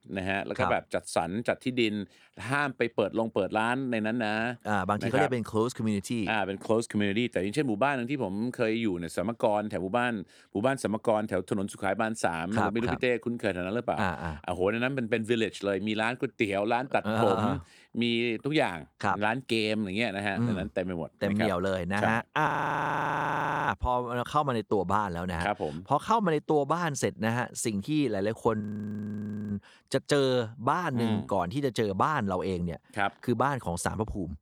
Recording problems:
audio freezing; at 22 s for 1 s and at 29 s for 1 s

